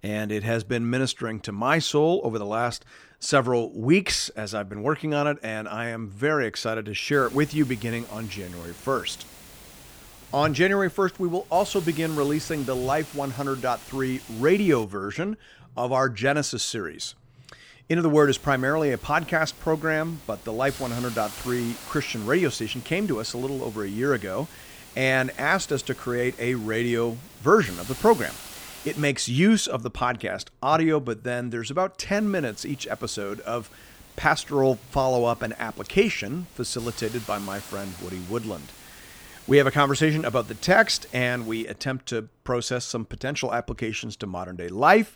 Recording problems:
hiss; noticeable; from 7 to 15 s, from 18 to 29 s and from 32 to 42 s; 20 dB below the speech

